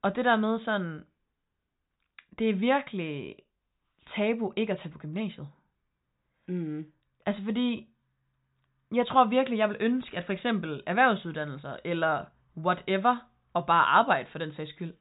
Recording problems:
high frequencies cut off; severe; nothing above 4 kHz

